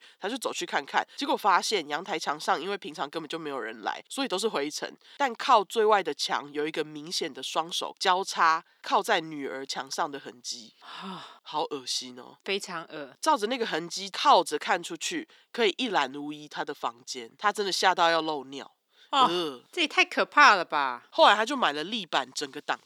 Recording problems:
thin; very slightly; fading below 300 Hz

